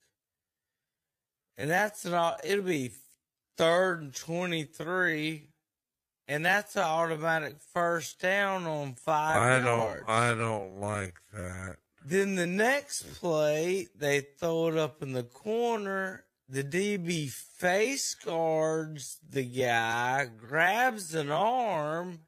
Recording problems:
wrong speed, natural pitch; too slow; 0.5 times normal speed

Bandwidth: 14.5 kHz